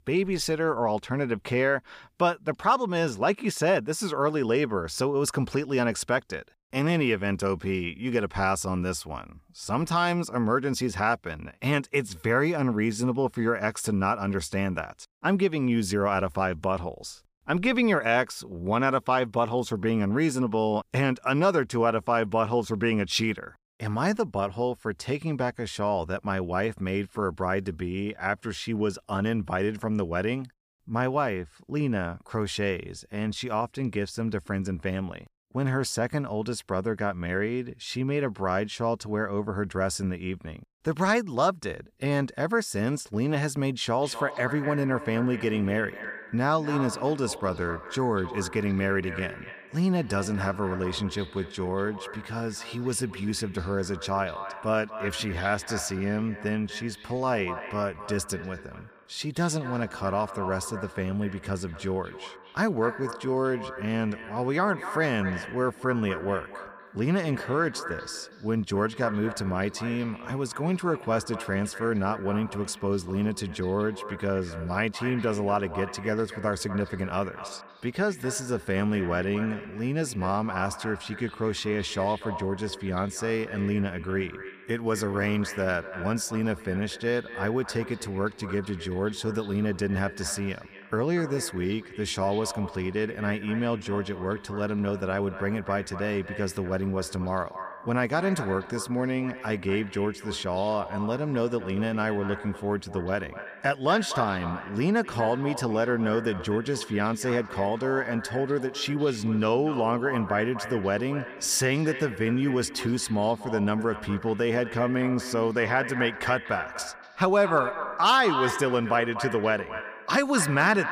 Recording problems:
echo of what is said; strong; from 44 s on; 240 ms later, 10 dB below the speech

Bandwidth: 15 kHz